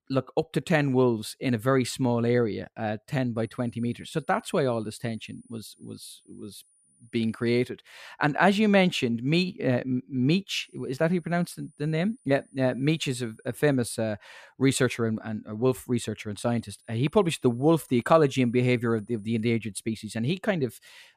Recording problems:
high-pitched whine; faint; from 3.5 to 7.5 s, from 11 to 14 s and from 16 to 20 s; 9.5 kHz, 35 dB below the speech

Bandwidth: 14.5 kHz